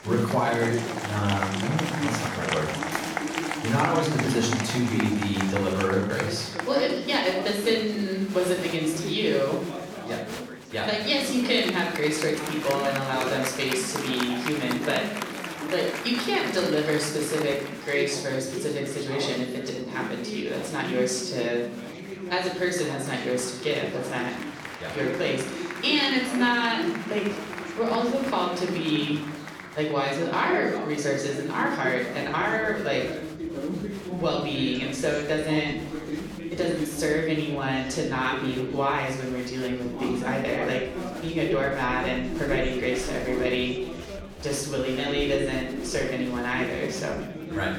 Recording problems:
off-mic speech; far
room echo; noticeable; dies away in 0.7 s
chatter from many people; loud; throughout; 7 dB below the speech

